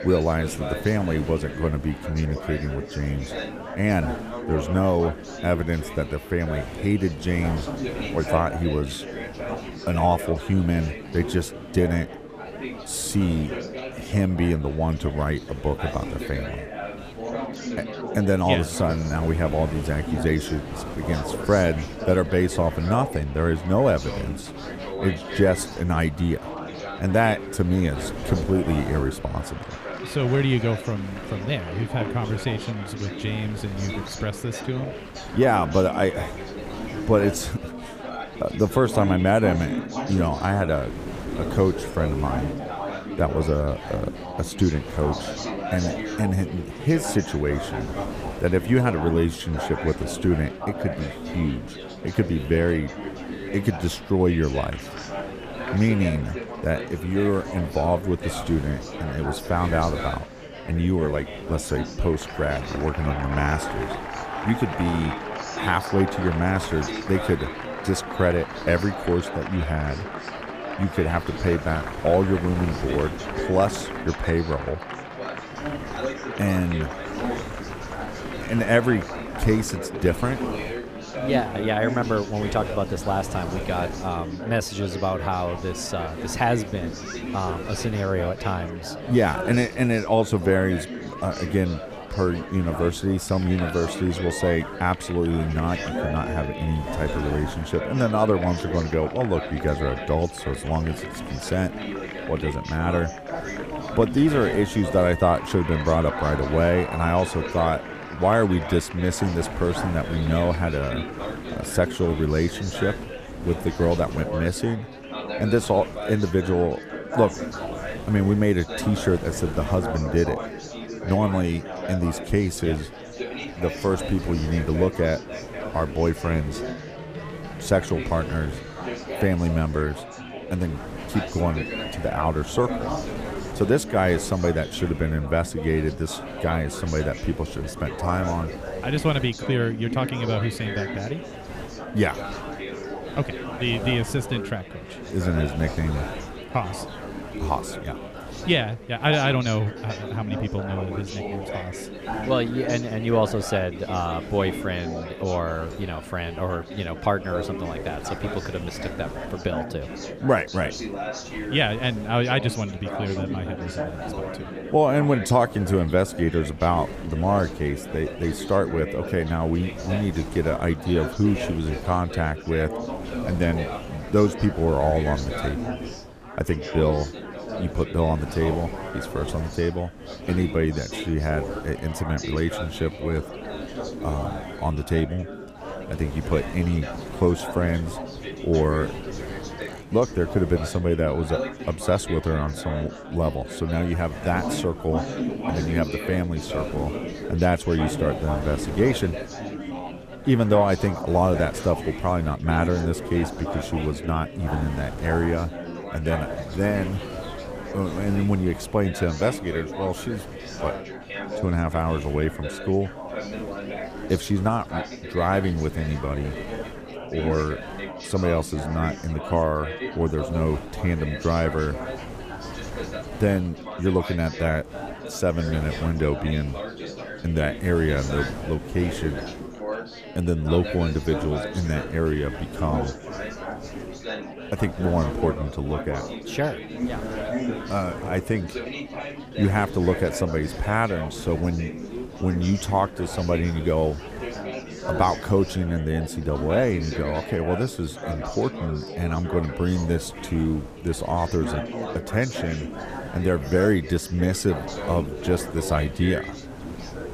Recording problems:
chatter from many people; loud; throughout; 8 dB below the speech
wind noise on the microphone; occasional gusts; 20 dB below the speech

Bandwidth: 15 kHz